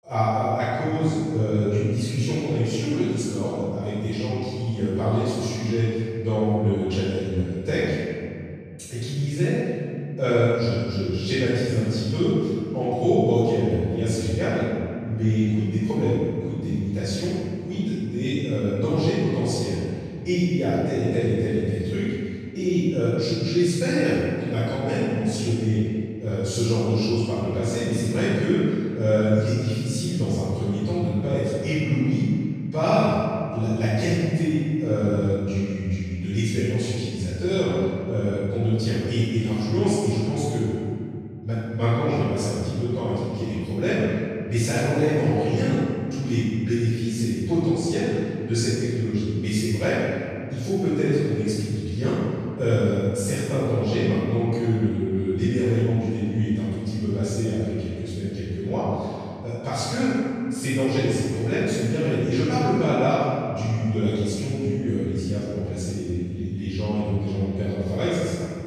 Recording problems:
room echo; strong; dies away in 2.3 s
off-mic speech; far

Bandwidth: 14 kHz